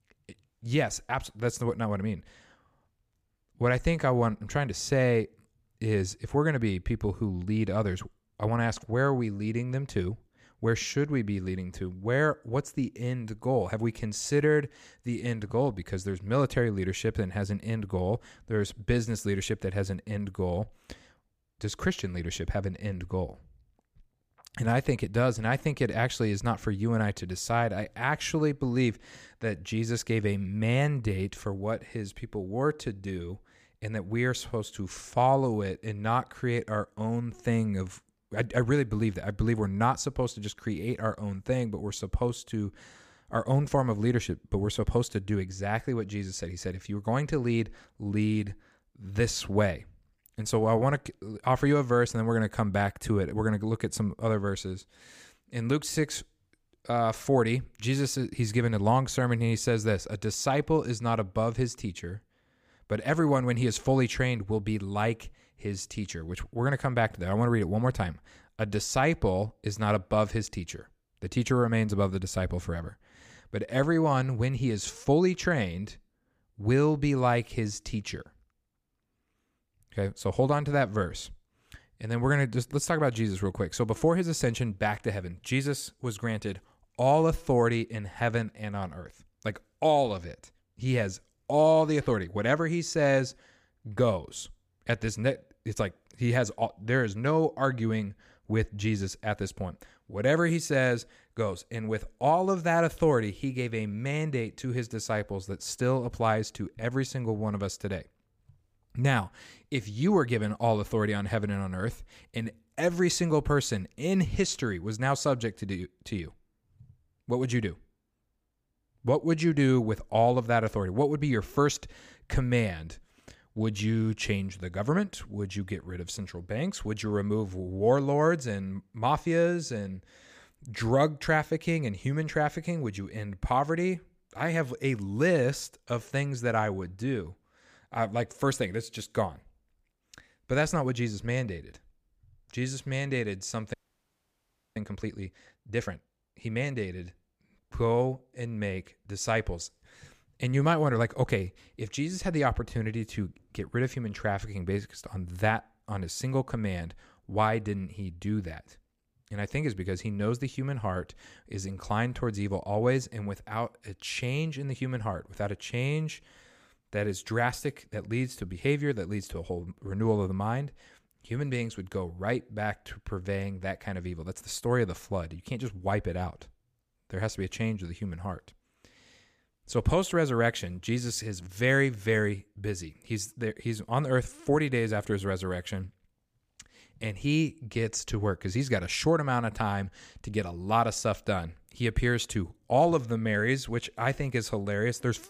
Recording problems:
audio freezing; at 2:24 for 1 s

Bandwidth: 15 kHz